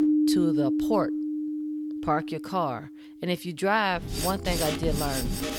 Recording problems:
background music; very loud; throughout; 1 dB above the speech

